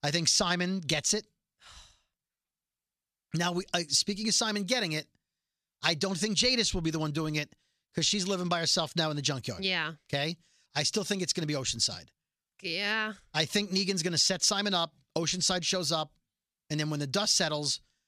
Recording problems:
none

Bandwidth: 14 kHz